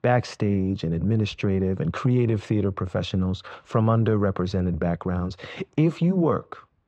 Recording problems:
muffled; very; fading above 2 kHz

